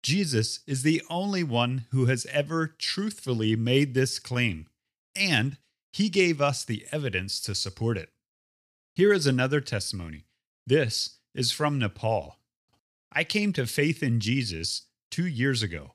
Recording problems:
none

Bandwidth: 15 kHz